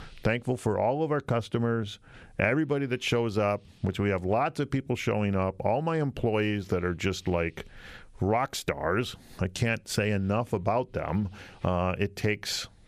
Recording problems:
squashed, flat; somewhat

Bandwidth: 14.5 kHz